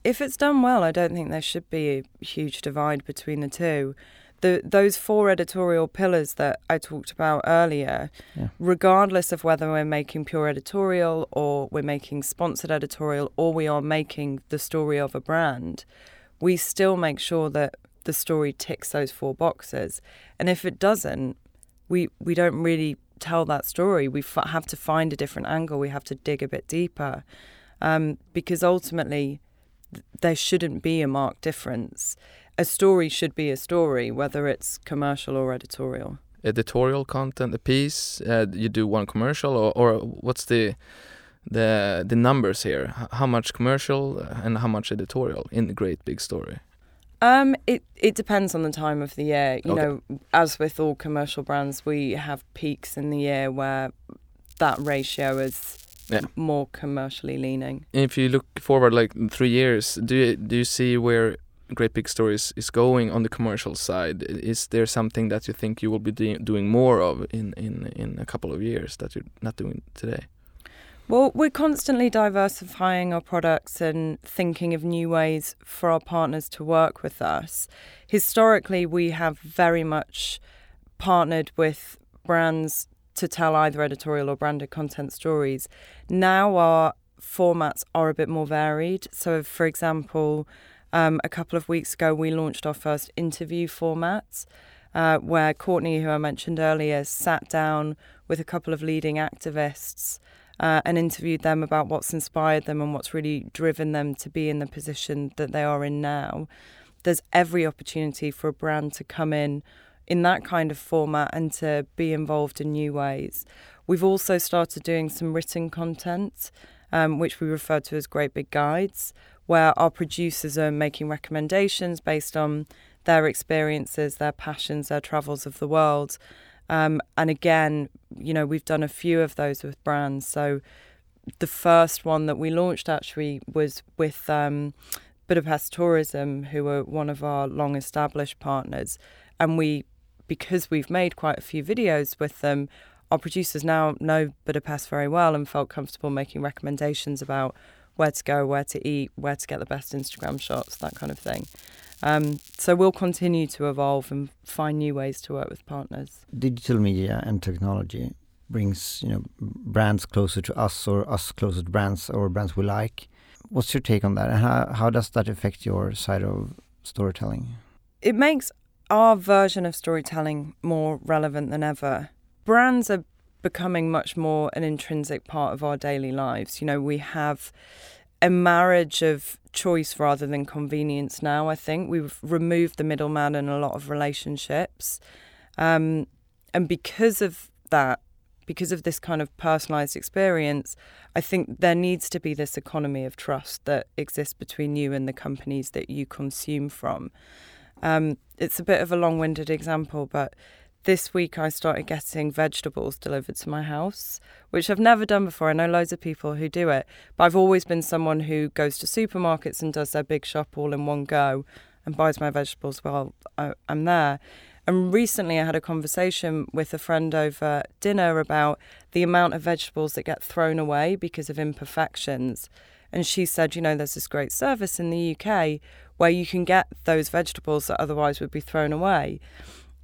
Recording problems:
crackling; faint; from 54 to 56 s and from 2:30 to 2:33; 20 dB below the speech

